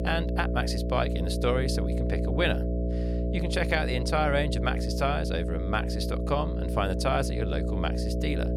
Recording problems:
electrical hum; loud; throughout; 60 Hz, 6 dB below the speech

